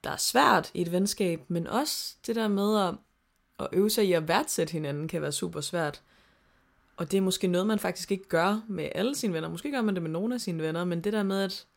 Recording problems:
none

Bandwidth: 16 kHz